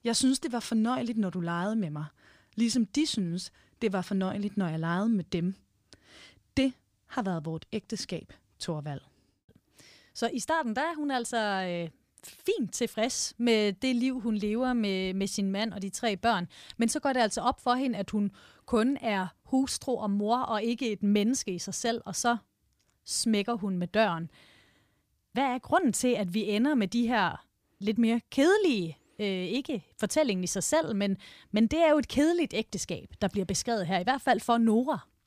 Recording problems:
none

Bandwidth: 15 kHz